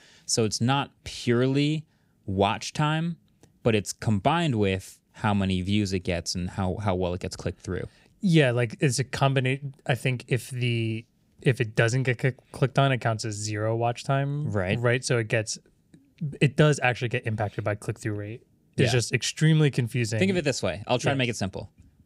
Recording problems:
none

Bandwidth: 15.5 kHz